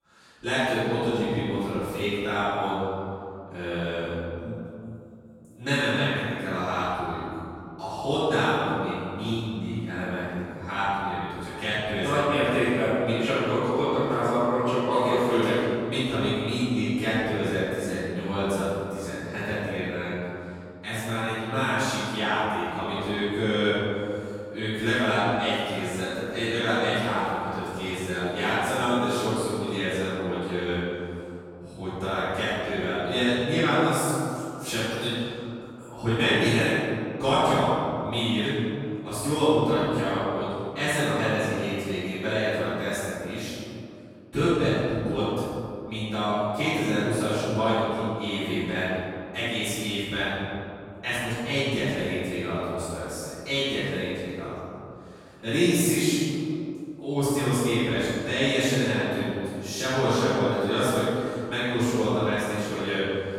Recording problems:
room echo; strong; dies away in 2.5 s
off-mic speech; far

